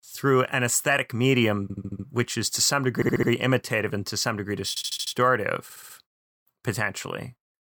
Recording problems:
audio stuttering; 4 times, first at 1.5 s

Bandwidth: 18 kHz